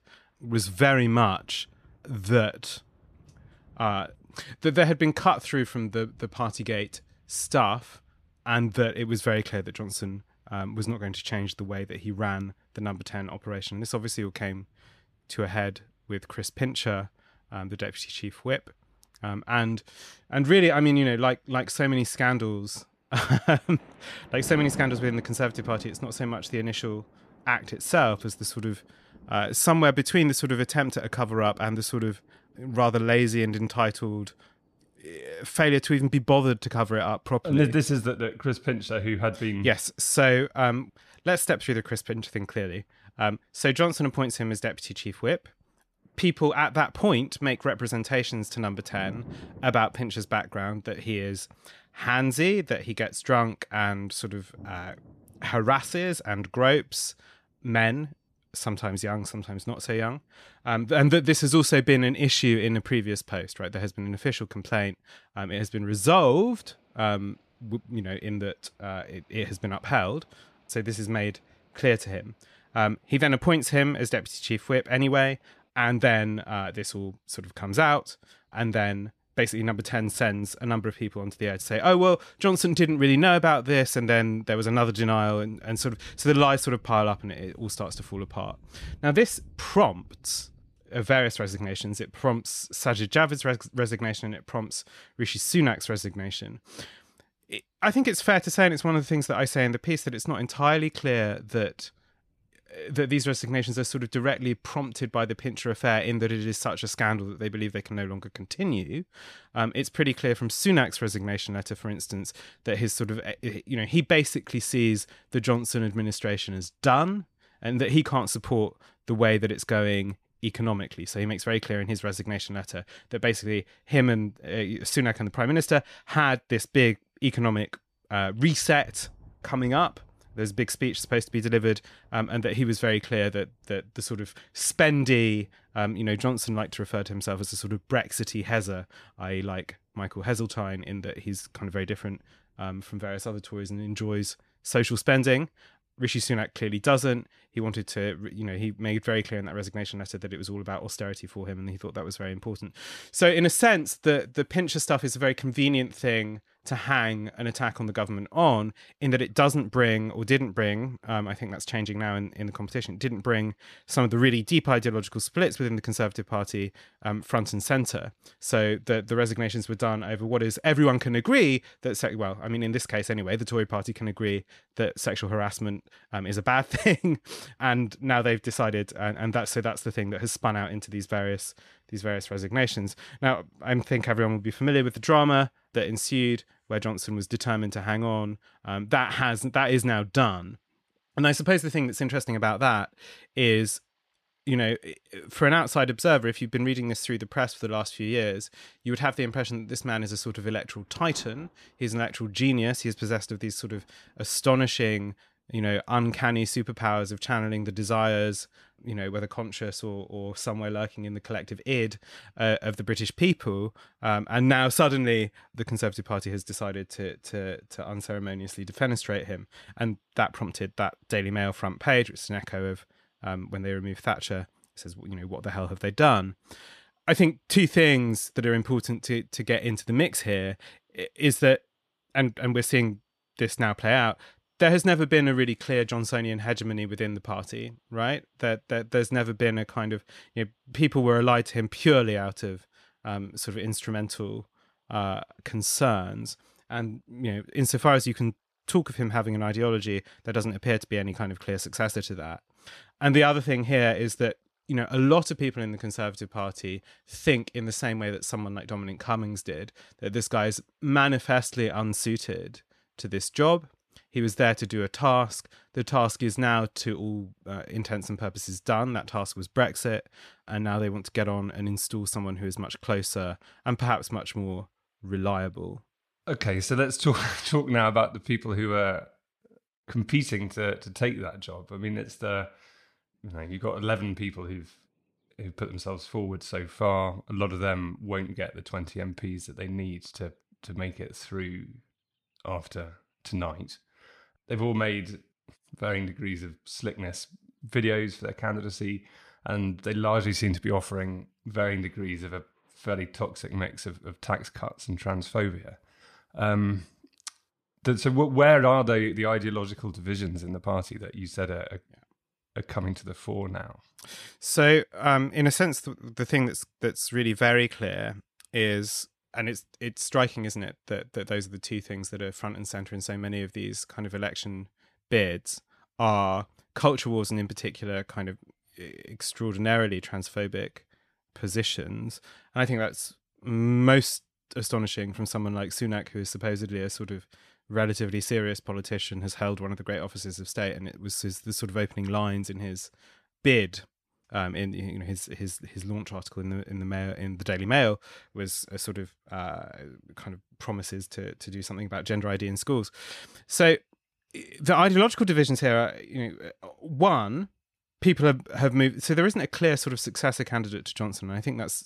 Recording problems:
rain or running water; faint; throughout; 25 dB below the speech

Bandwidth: 14 kHz